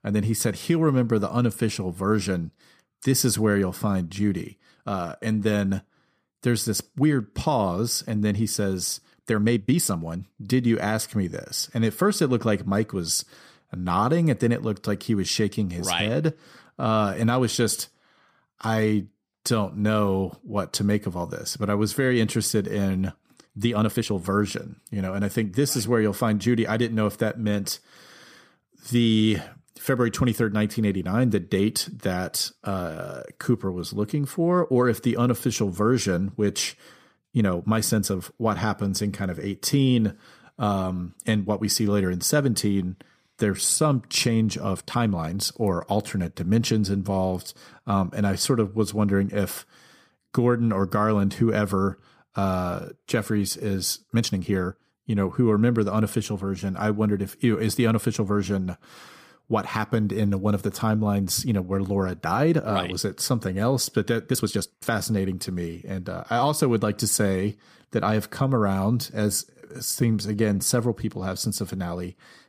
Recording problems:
uneven, jittery; strongly; from 4.5 s to 1:11

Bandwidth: 15 kHz